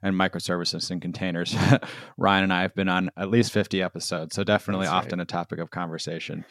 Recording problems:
none

